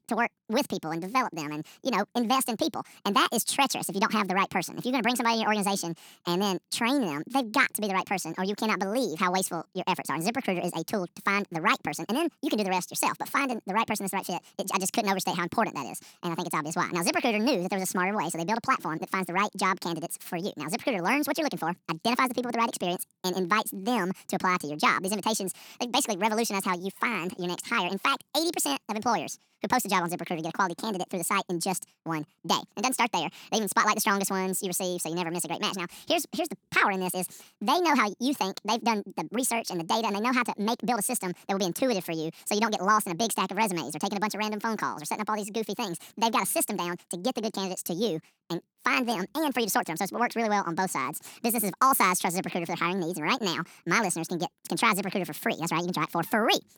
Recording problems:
wrong speed and pitch; too fast and too high; 1.6 times normal speed

